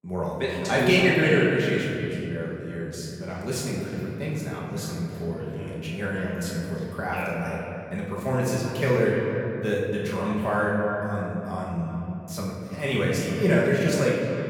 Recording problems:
echo of what is said; strong; throughout; 300 ms later, 10 dB below the speech
off-mic speech; far
room echo; noticeable; dies away in 2.6 s

